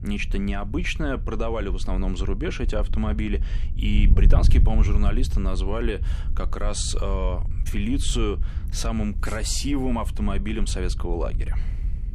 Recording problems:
wind noise on the microphone; occasional gusts; 15 dB below the speech

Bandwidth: 14 kHz